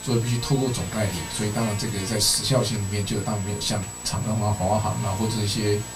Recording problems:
off-mic speech; far
room echo; very slight; dies away in 0.2 s
electrical hum; loud; throughout; 60 Hz, 10 dB below the speech
high-pitched whine; noticeable; throughout; 8 kHz, 10 dB below the speech

